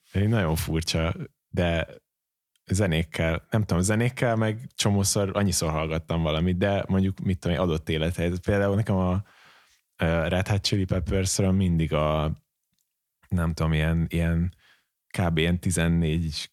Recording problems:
none

